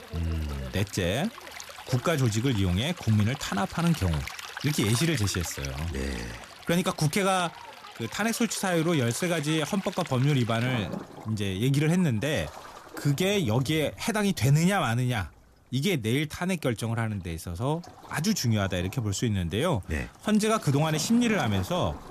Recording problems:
rain or running water; noticeable; throughout; 15 dB below the speech

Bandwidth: 14.5 kHz